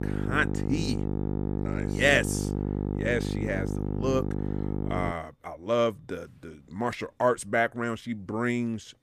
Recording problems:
electrical hum; loud; until 5 s; 50 Hz, 9 dB below the speech

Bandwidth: 15 kHz